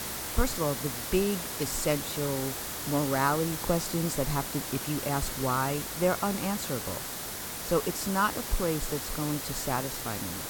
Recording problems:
hiss; loud; throughout; 3 dB below the speech

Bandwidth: 17 kHz